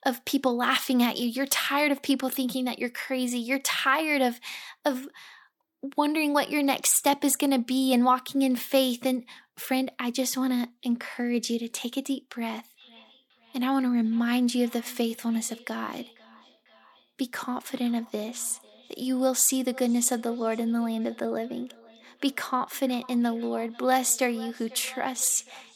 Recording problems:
echo of what is said; faint; from 13 s on; 490 ms later, 25 dB below the speech

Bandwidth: 18 kHz